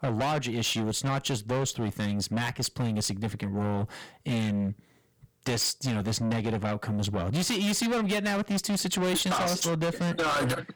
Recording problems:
distortion; heavy; 6 dB below the speech

